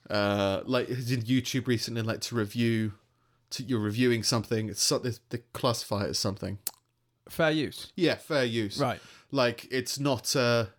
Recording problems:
none

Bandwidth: 18 kHz